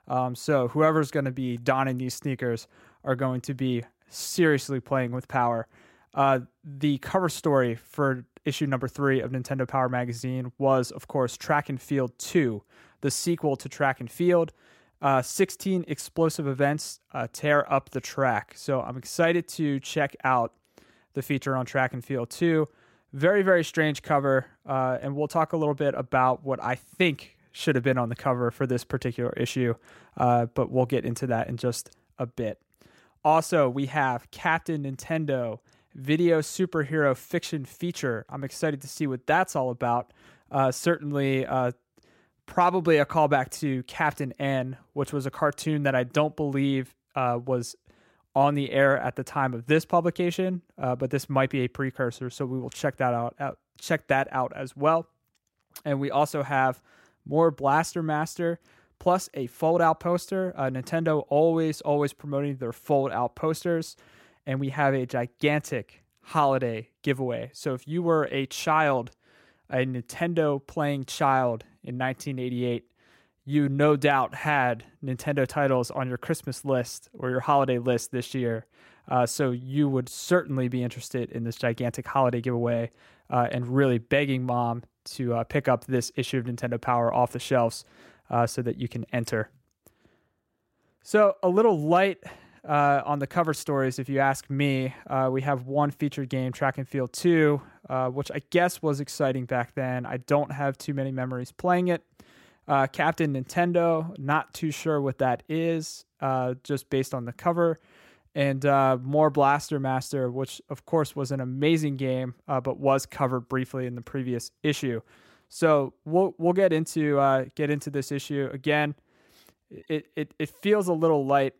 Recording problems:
none

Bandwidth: 16 kHz